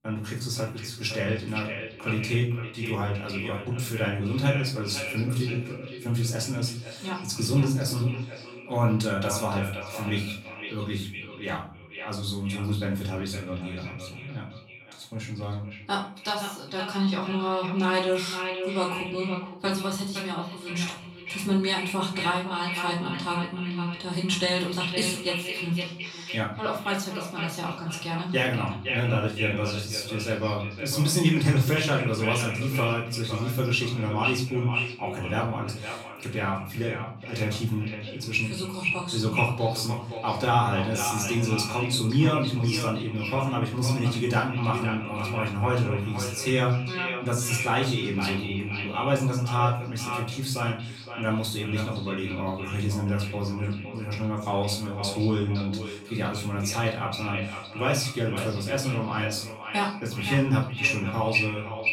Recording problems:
echo of what is said; strong; throughout; 510 ms later, 7 dB below the speech
off-mic speech; far
room echo; slight; dies away in 0.4 s

